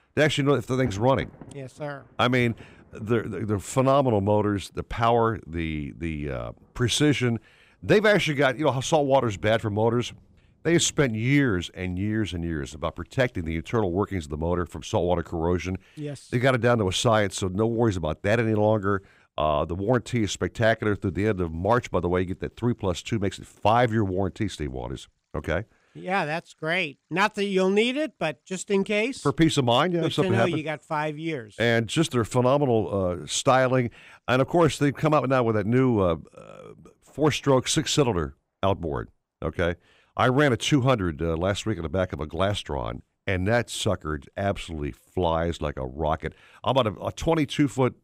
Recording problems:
rain or running water; faint; throughout; 25 dB below the speech

